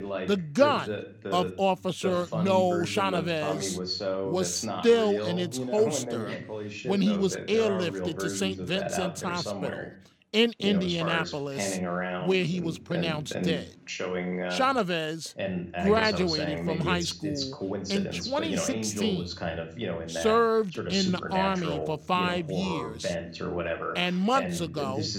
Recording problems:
voice in the background; loud; throughout; 5 dB below the speech

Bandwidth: 17.5 kHz